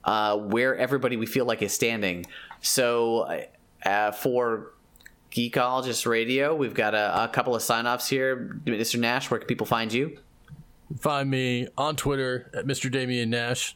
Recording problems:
squashed, flat; somewhat

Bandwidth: 17 kHz